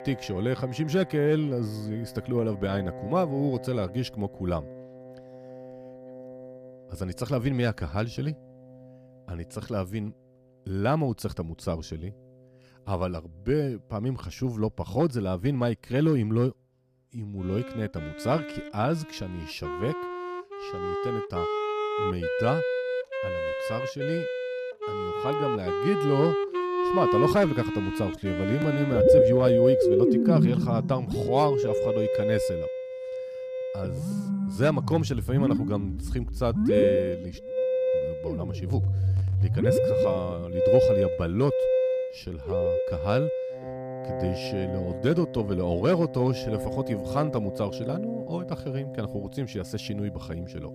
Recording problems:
background music; very loud; throughout; 2 dB above the speech

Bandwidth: 15 kHz